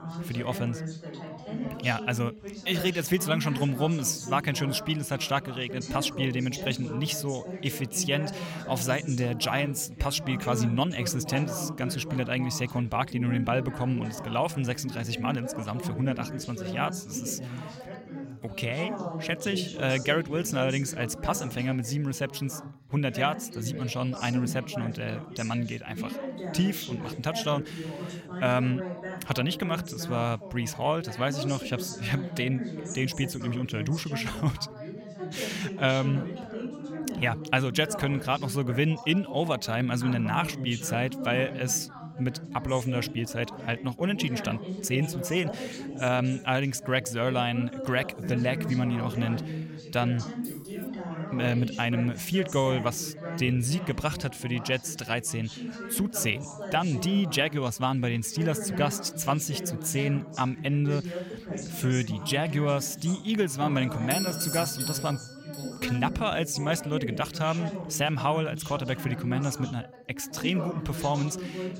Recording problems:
background chatter; loud; throughout; 3 voices, 8 dB below the speech
jangling keys; faint; at 50 s; peak 15 dB below the speech
doorbell; noticeable; from 1:04 to 1:06; peak 1 dB below the speech

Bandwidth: 16.5 kHz